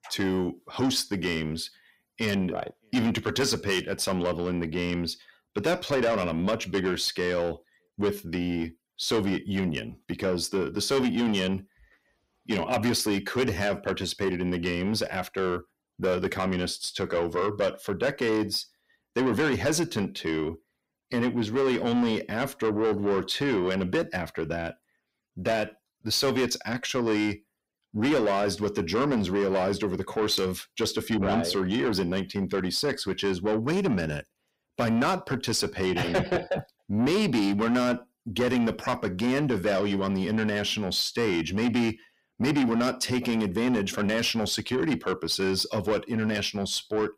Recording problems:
distortion; heavy; 8 dB below the speech

